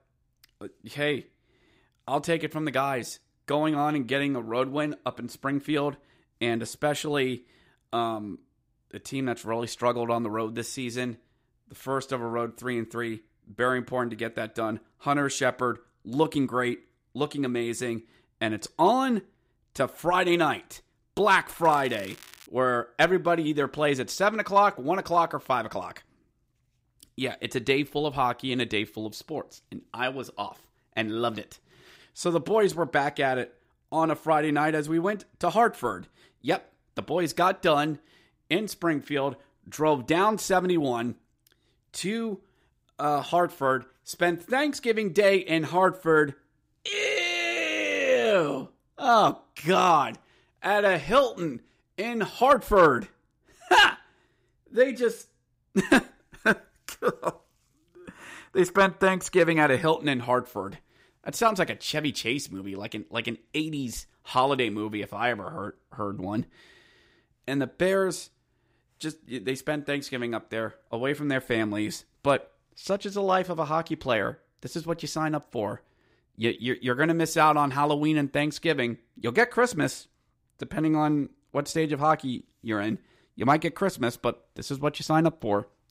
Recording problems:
crackling; faint; at 22 s; 20 dB below the speech

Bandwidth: 15.5 kHz